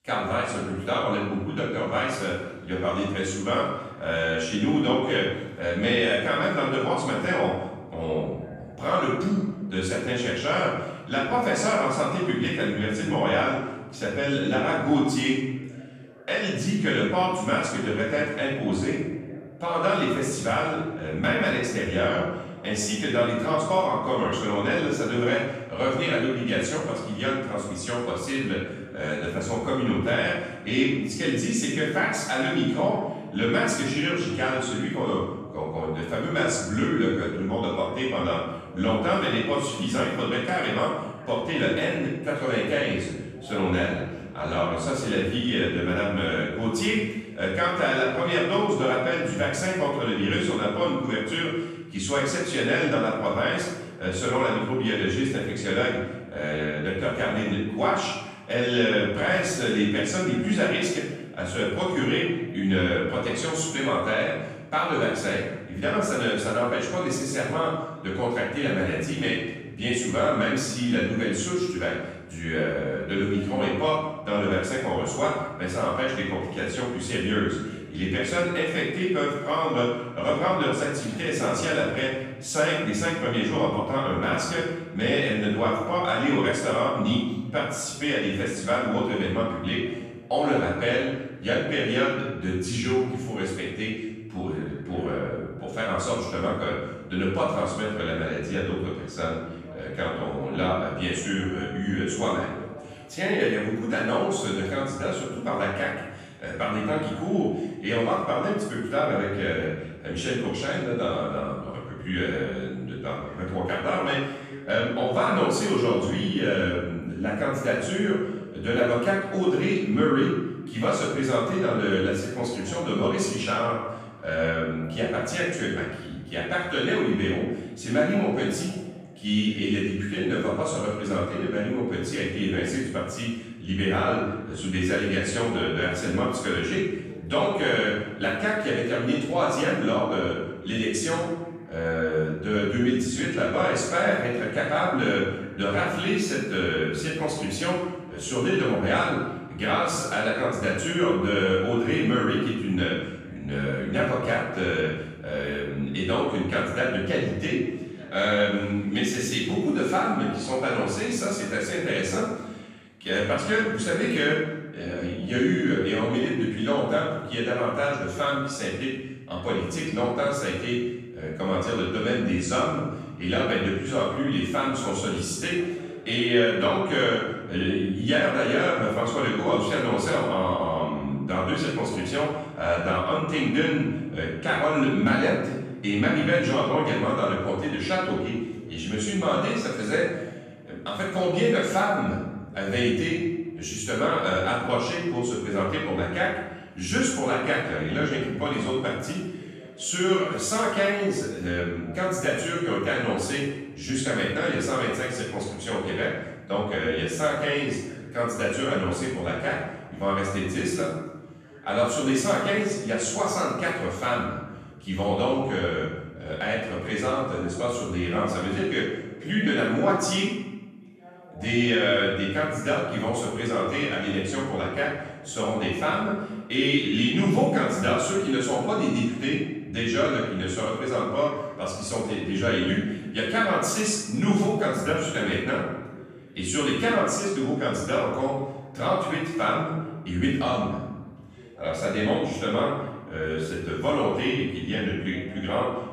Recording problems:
off-mic speech; far
room echo; noticeable; dies away in 1.1 s
voice in the background; faint; throughout; 20 dB below the speech

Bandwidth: 13.5 kHz